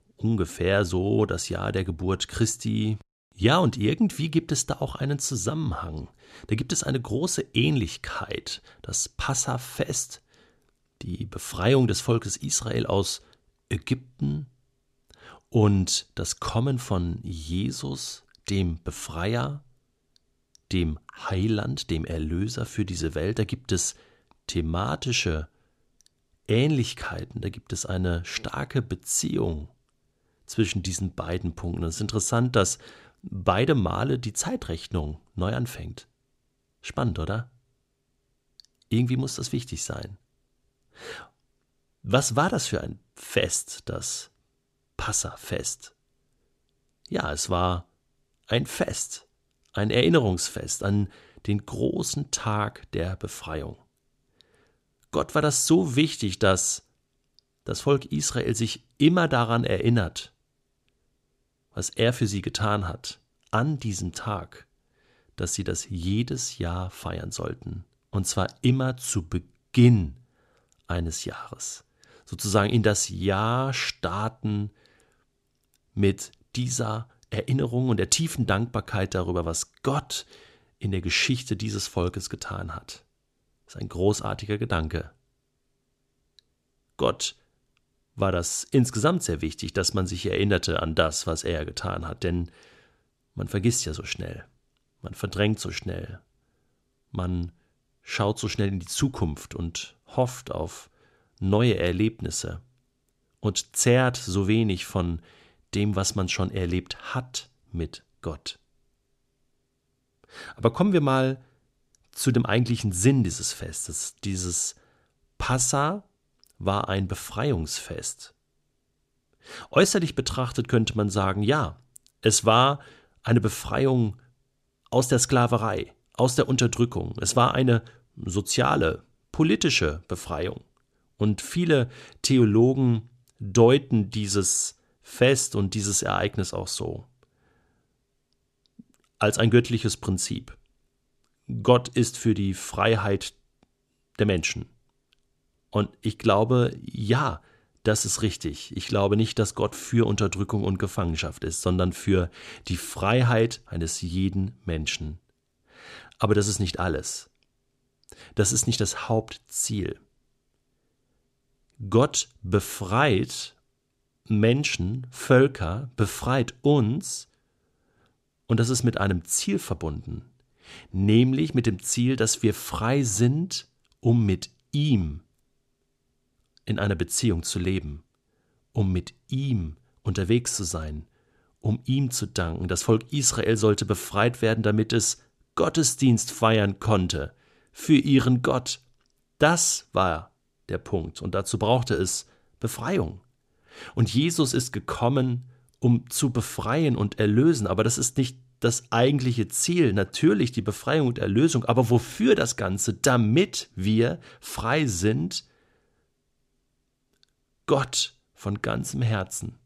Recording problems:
none

